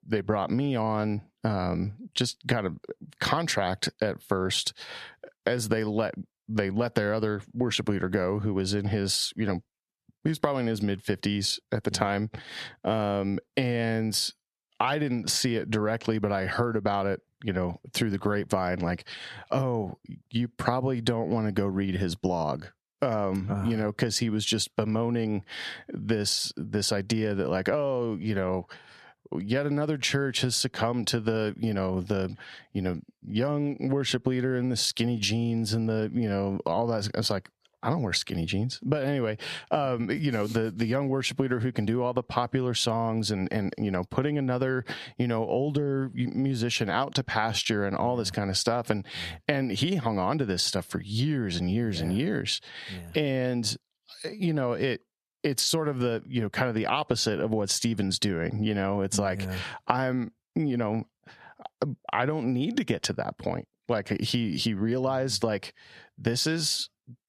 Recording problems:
squashed, flat; heavily

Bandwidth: 13.5 kHz